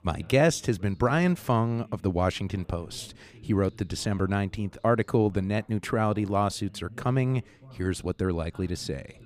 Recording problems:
background chatter; faint; throughout; 3 voices, 25 dB below the speech

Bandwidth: 15 kHz